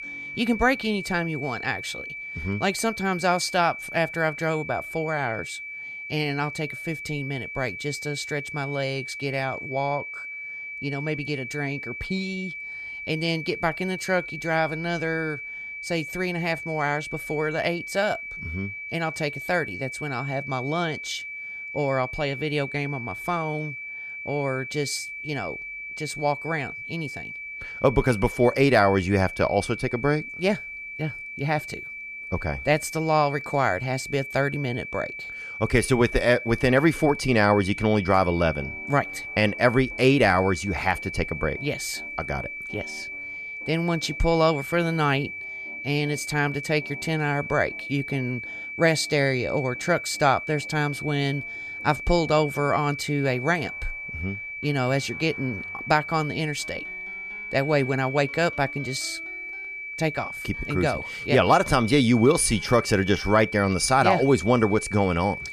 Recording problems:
high-pitched whine; loud; throughout; 2.5 kHz, 8 dB below the speech
background music; faint; throughout; 30 dB below the speech

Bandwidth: 14.5 kHz